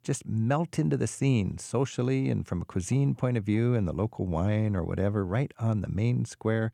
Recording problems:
none

